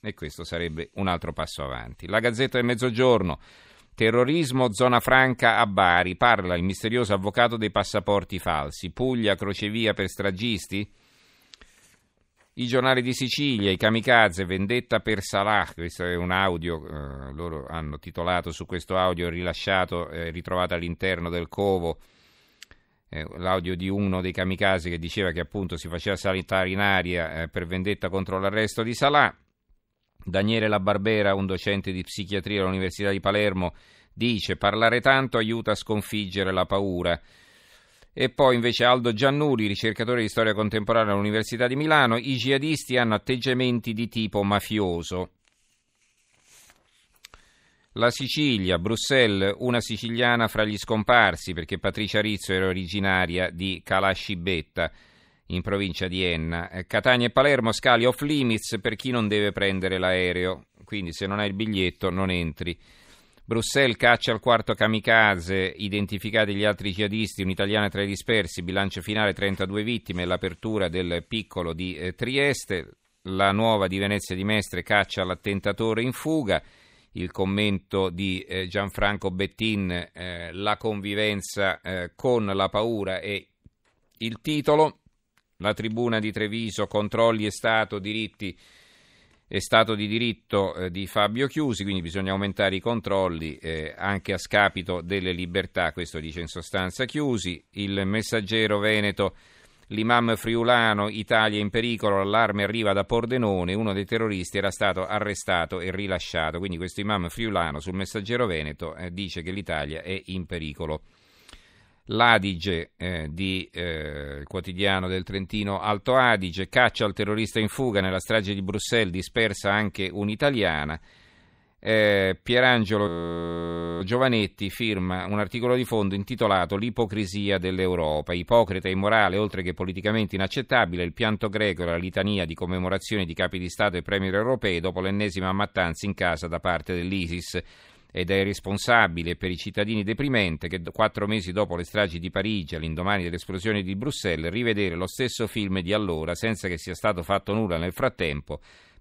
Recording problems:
audio freezing; at 2:03 for 1 s

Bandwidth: 15.5 kHz